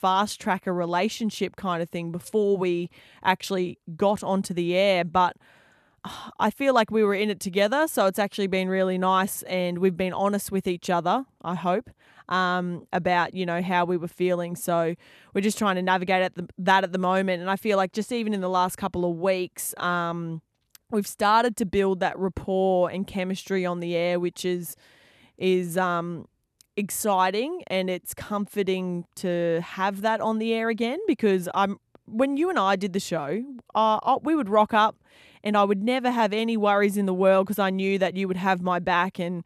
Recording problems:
none

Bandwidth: 13.5 kHz